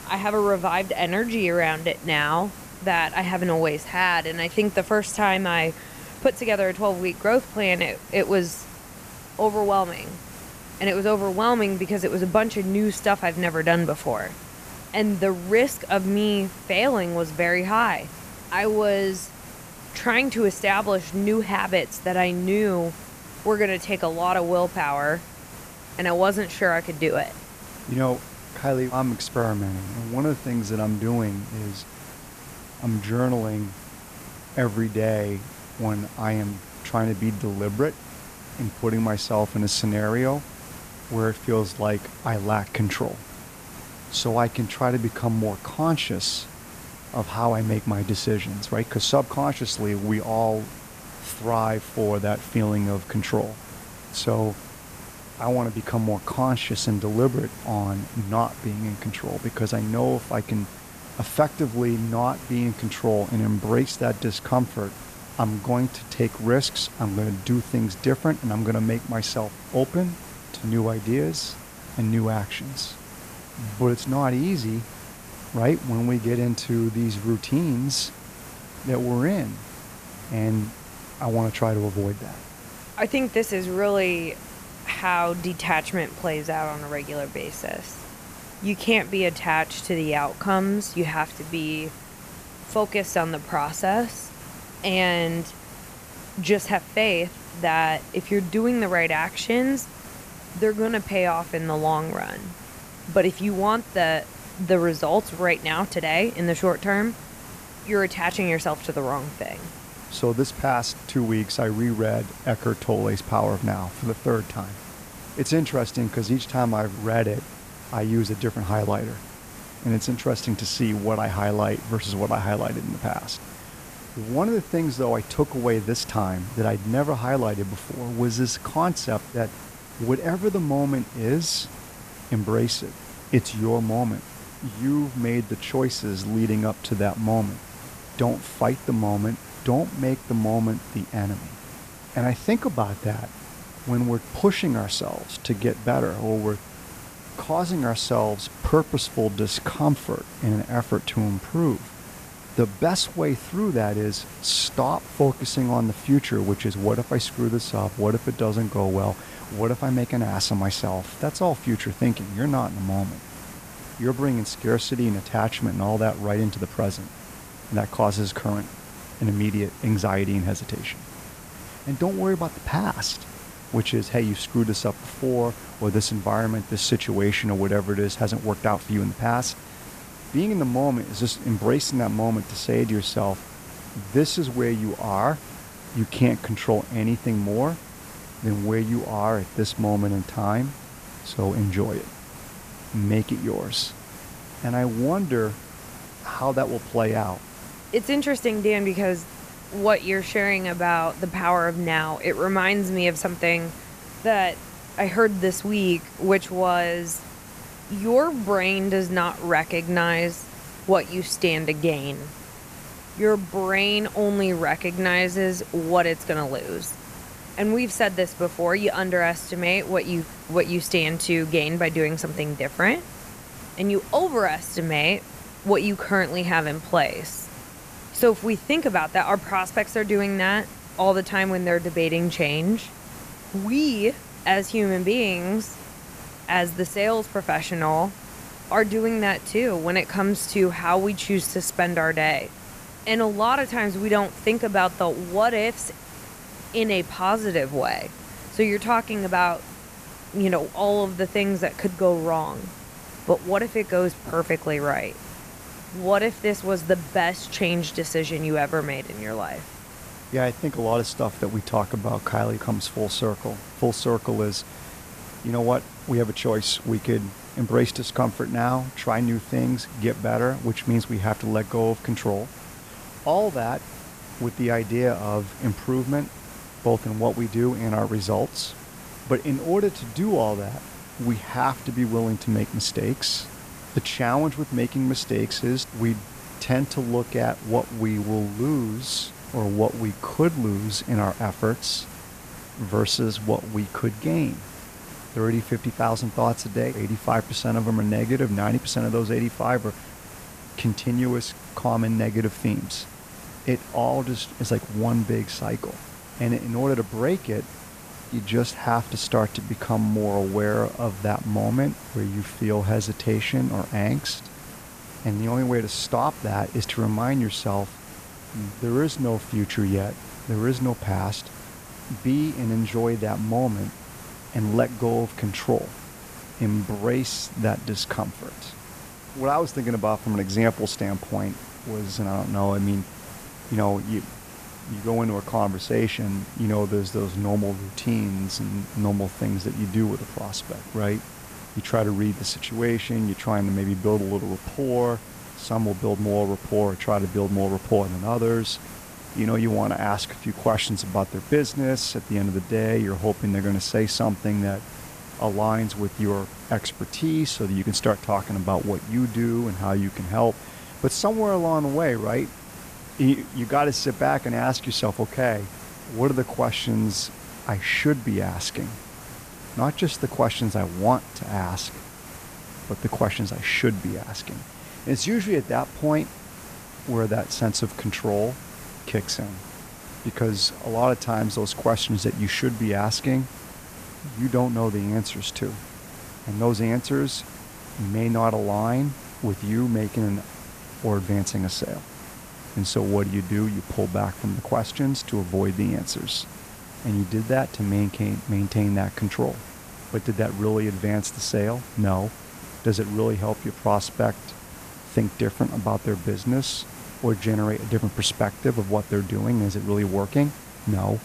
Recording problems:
hiss; noticeable; throughout; 15 dB below the speech

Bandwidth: 14.5 kHz